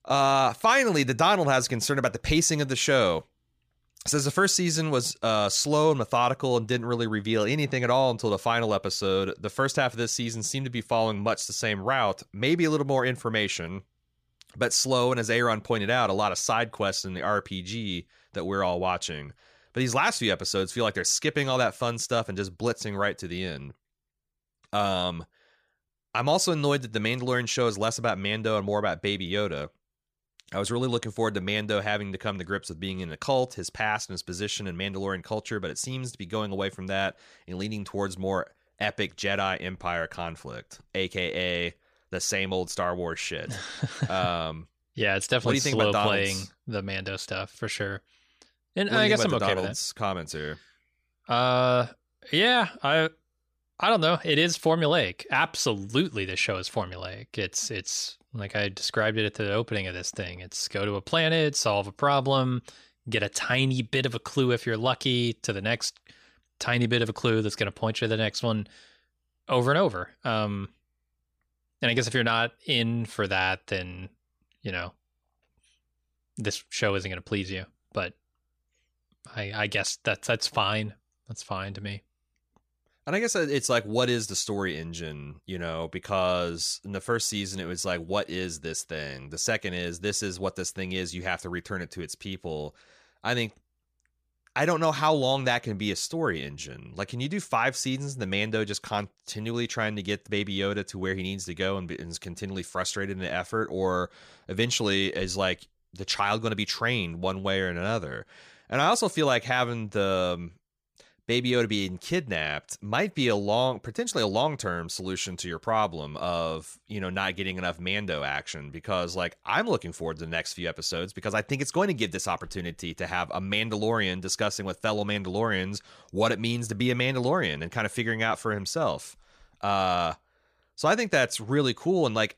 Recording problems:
none

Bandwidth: 15 kHz